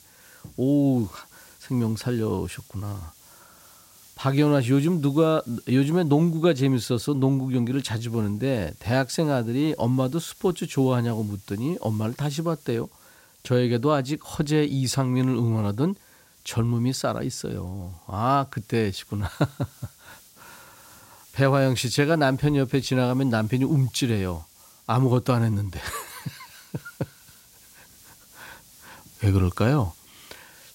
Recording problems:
hiss; faint; throughout; 25 dB below the speech

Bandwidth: 16 kHz